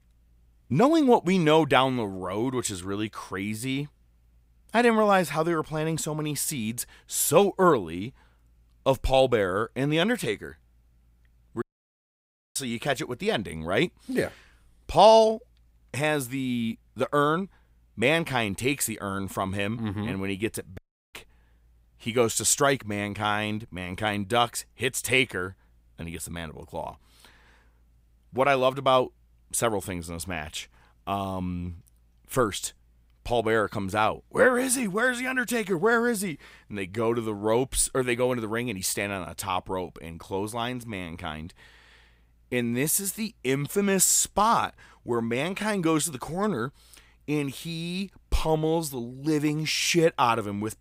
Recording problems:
audio cutting out; at 12 s for 1 s and at 21 s

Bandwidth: 15.5 kHz